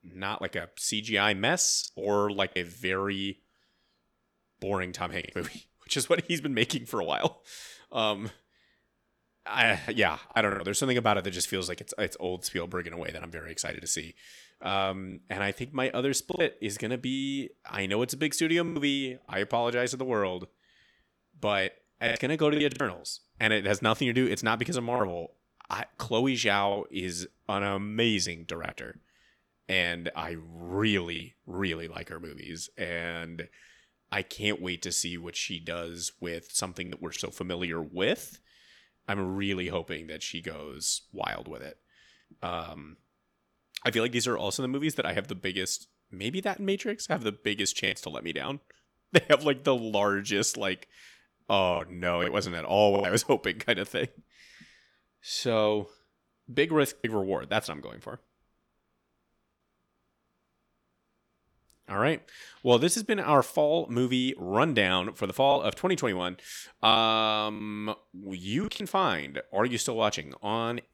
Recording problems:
choppy; occasionally; 3% of the speech affected

